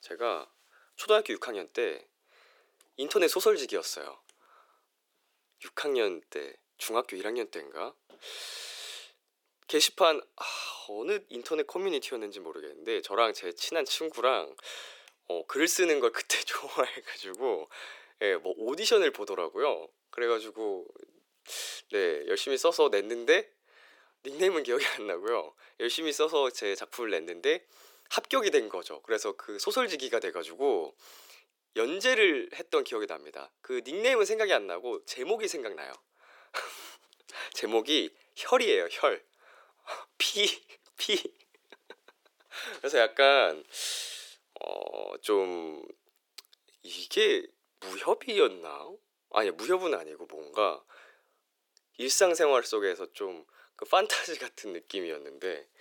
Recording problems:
thin; very; fading below 350 Hz

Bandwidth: 18 kHz